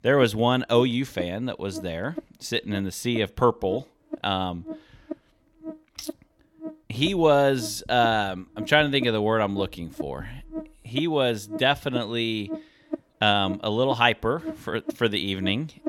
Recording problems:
electrical hum; noticeable; throughout; 50 Hz, 15 dB below the speech

